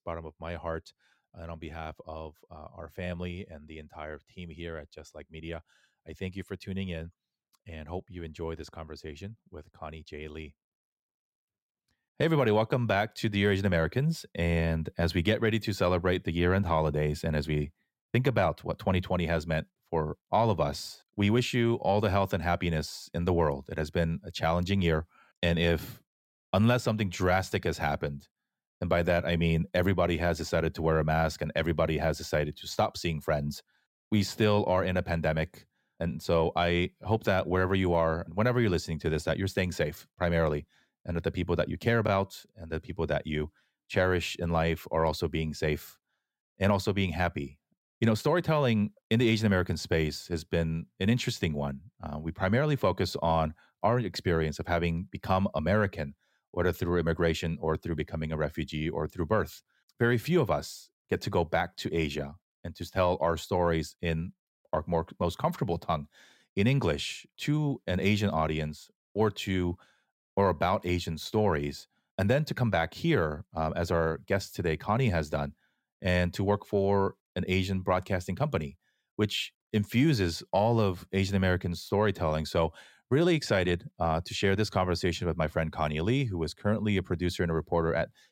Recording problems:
none

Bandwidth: 16 kHz